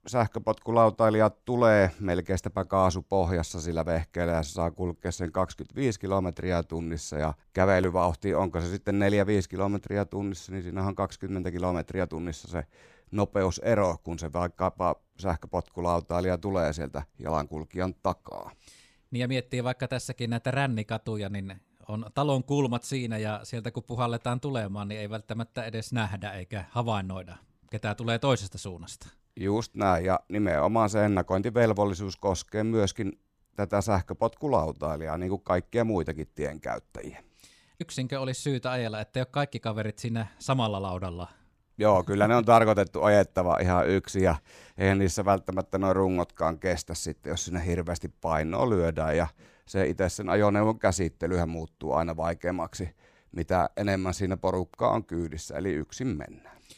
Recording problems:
none

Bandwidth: 15 kHz